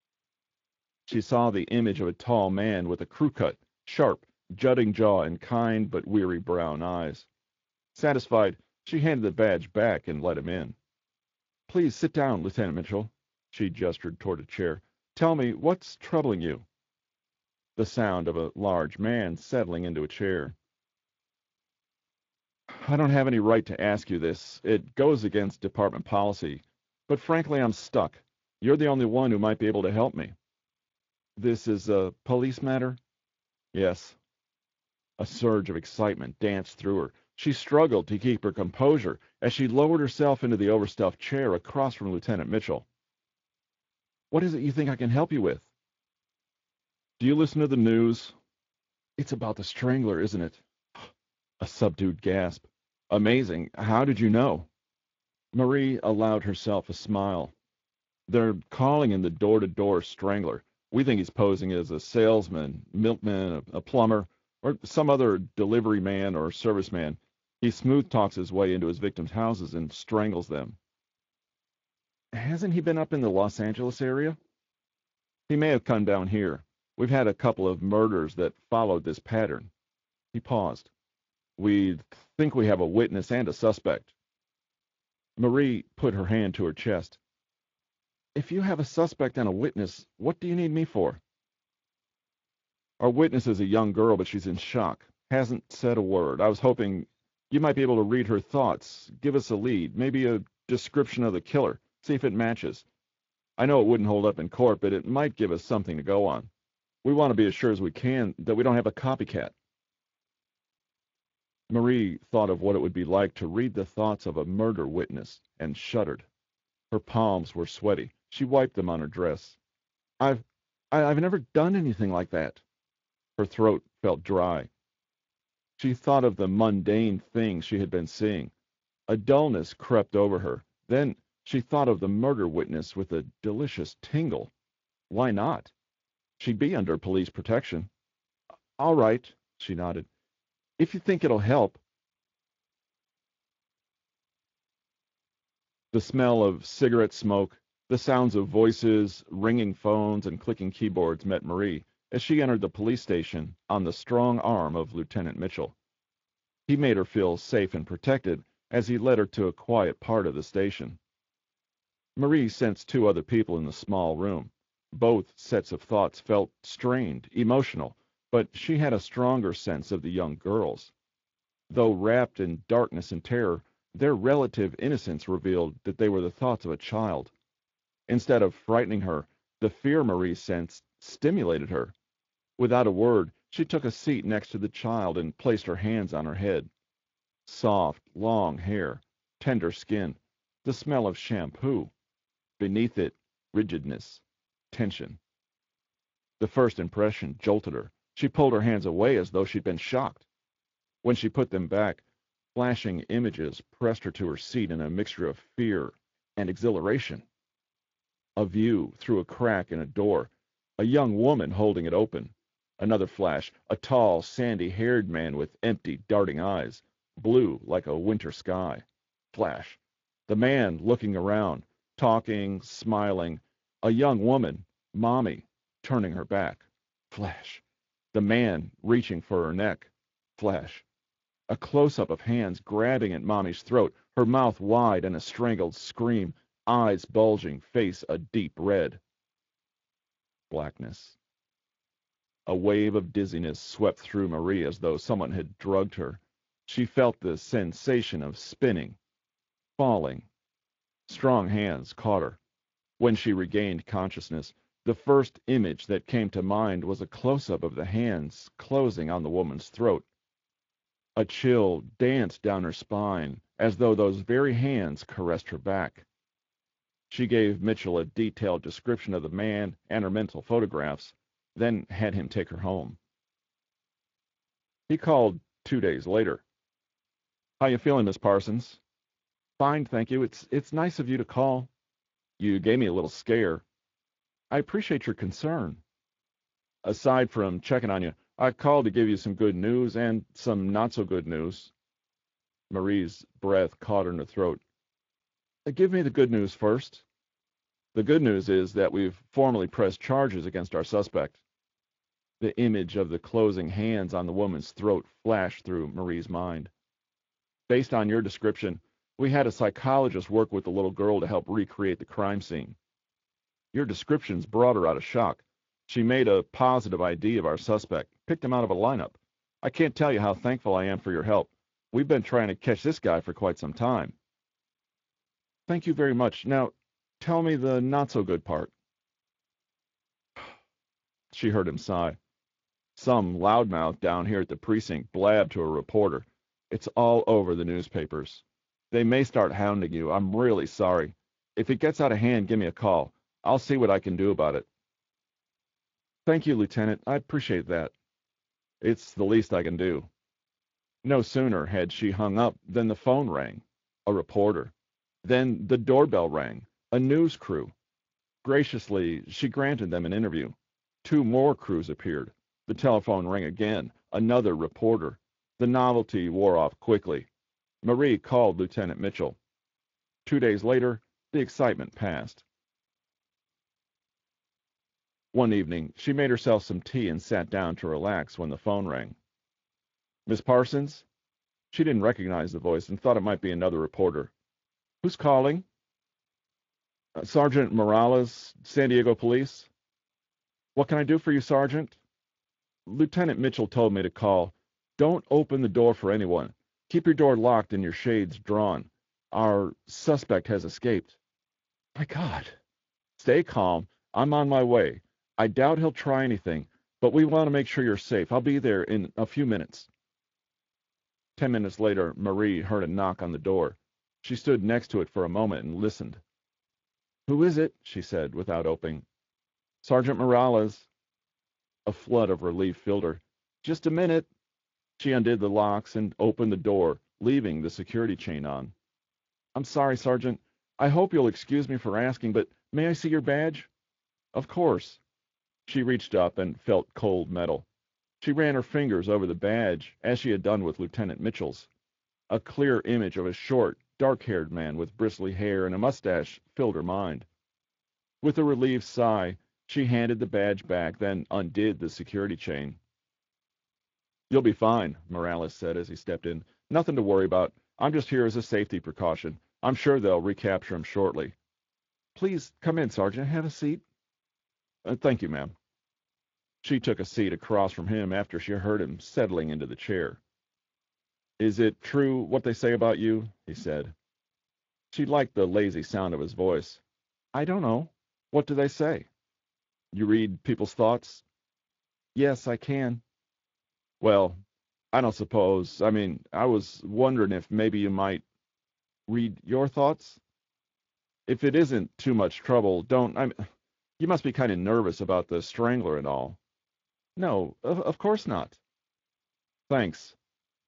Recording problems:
garbled, watery; slightly; nothing above 7.5 kHz
high frequencies cut off; slight

